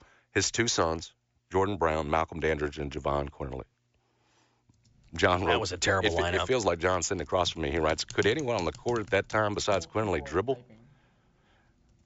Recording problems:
high frequencies cut off; noticeable; nothing above 7.5 kHz
household noises; noticeable; from 5 s on; 20 dB below the speech

